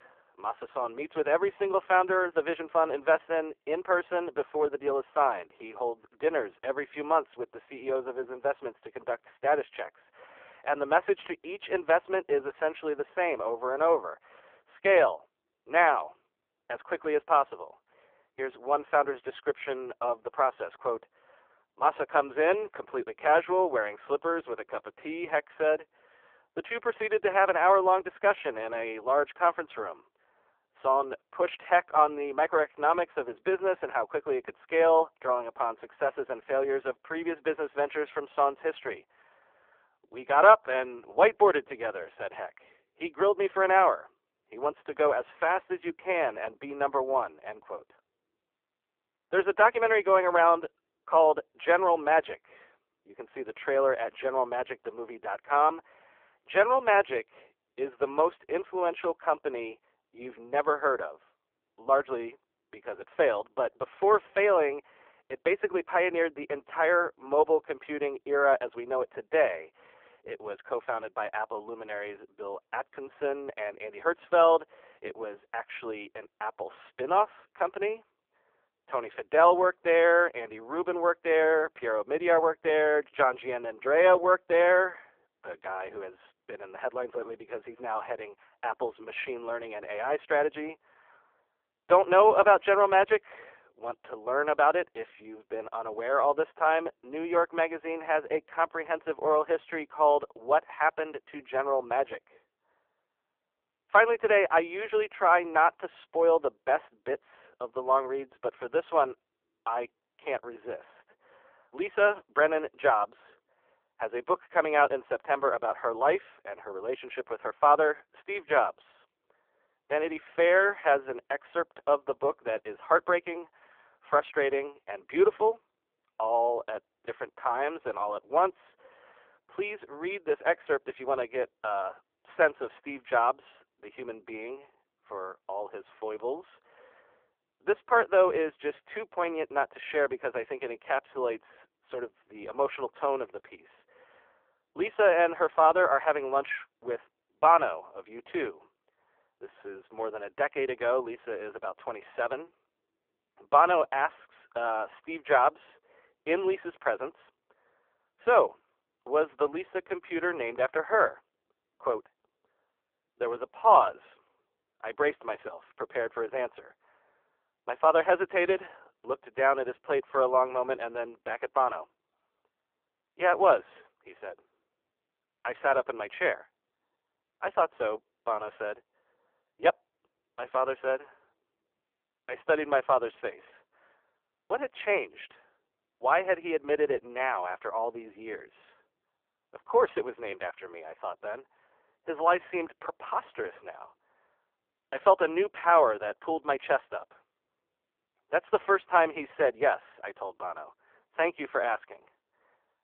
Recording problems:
phone-call audio; poor line; nothing above 3.5 kHz
muffled; very slightly; fading above 3 kHz

